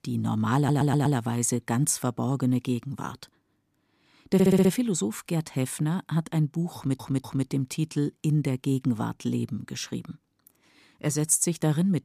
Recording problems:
audio stuttering; at 0.5 s, at 4.5 s and at 7 s

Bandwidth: 14.5 kHz